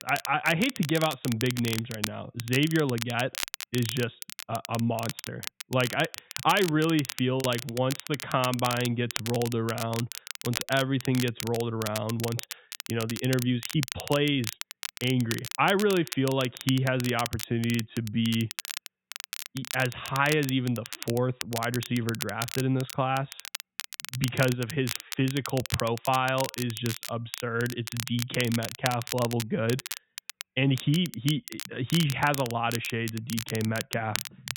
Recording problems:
high frequencies cut off; severe; nothing above 4 kHz
crackle, like an old record; loud; 8 dB below the speech
choppy; occasionally; at 7.5 s and at 20 s; 2% of the speech affected

